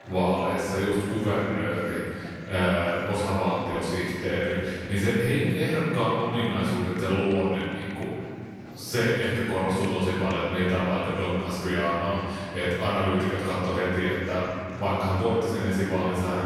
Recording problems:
room echo; strong; dies away in 2.5 s
off-mic speech; far
murmuring crowd; noticeable; throughout; 20 dB below the speech
abrupt cut into speech; at the end

